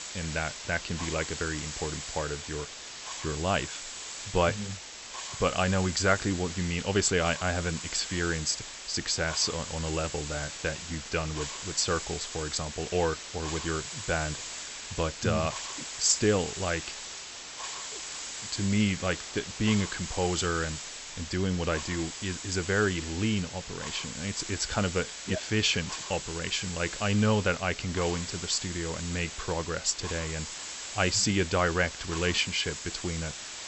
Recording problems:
high frequencies cut off; noticeable; nothing above 8 kHz
hiss; loud; throughout; 7 dB below the speech

